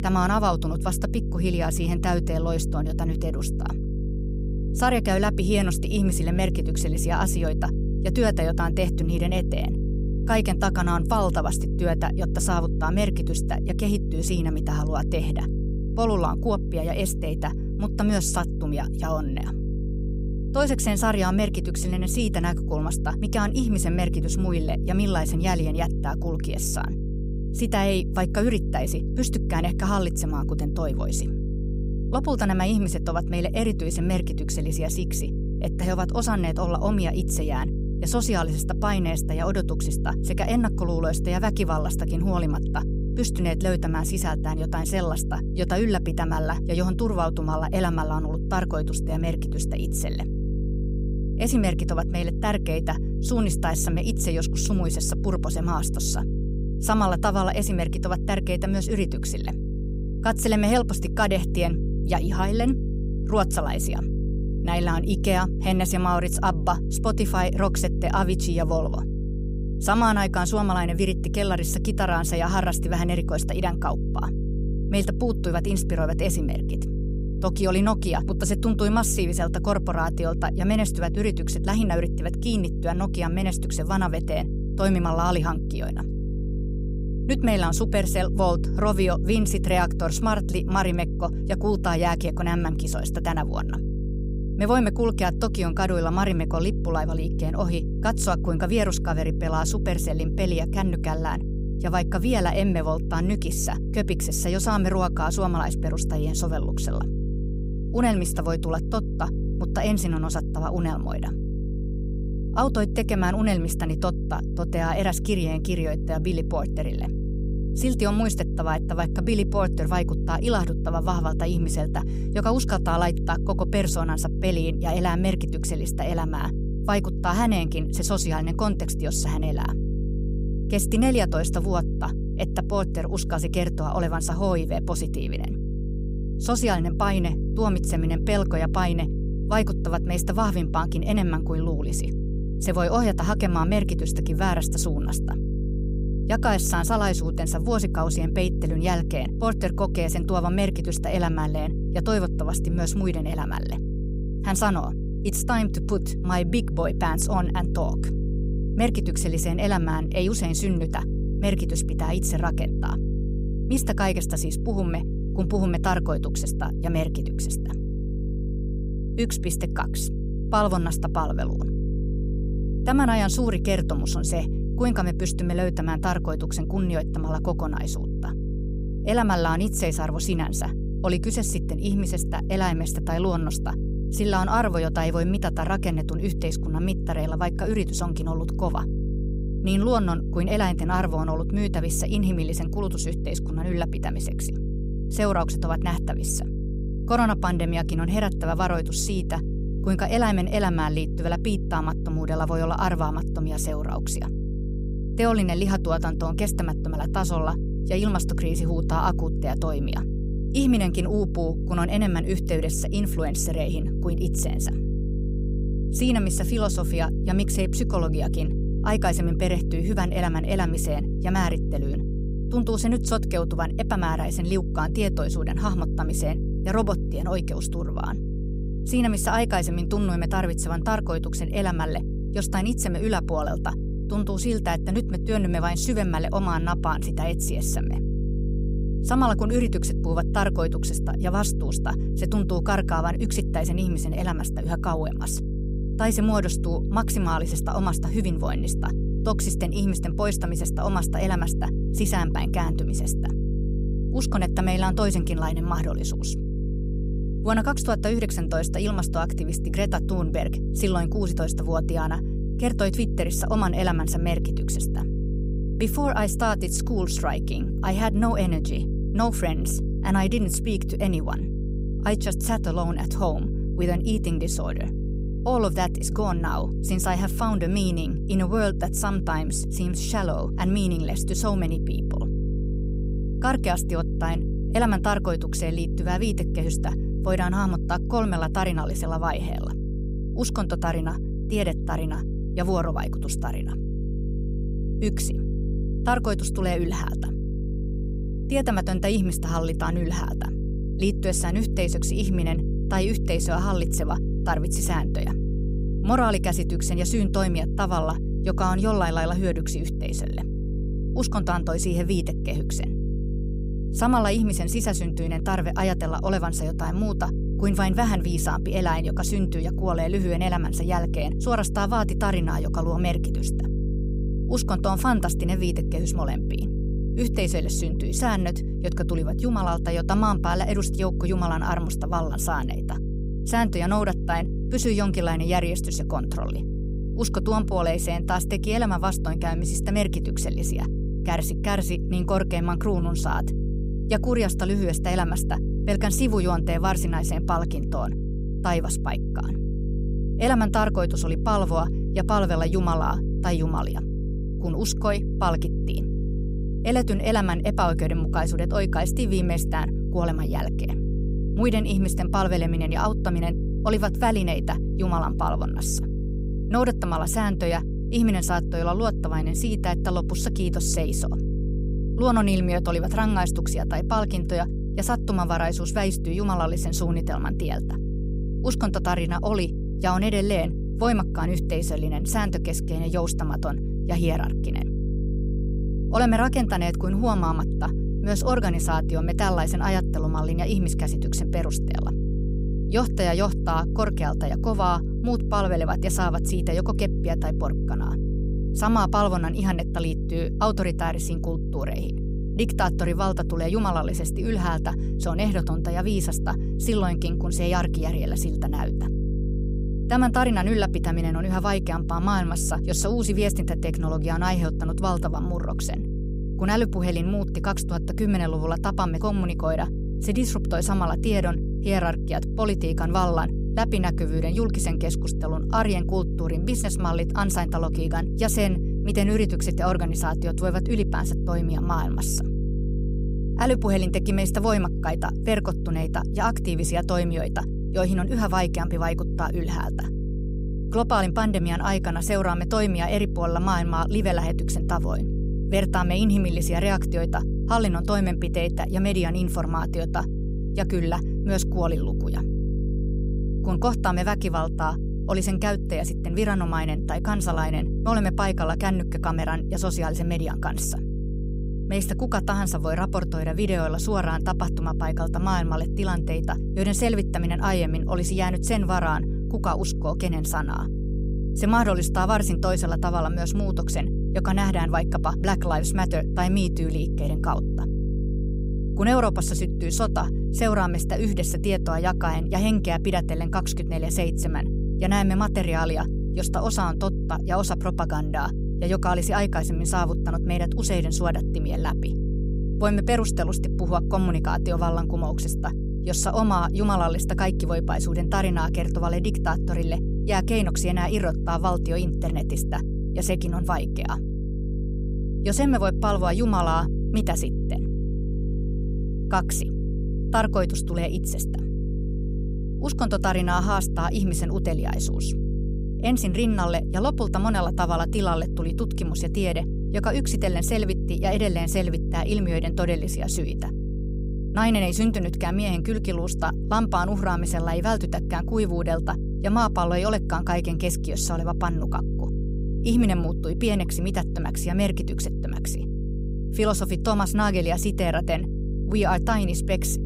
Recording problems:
electrical hum; noticeable; throughout; 50 Hz, 10 dB below the speech

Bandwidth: 15.5 kHz